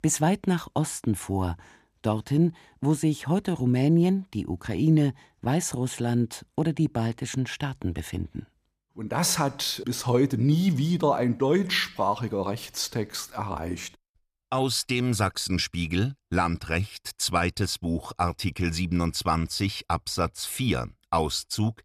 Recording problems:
none

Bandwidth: 15 kHz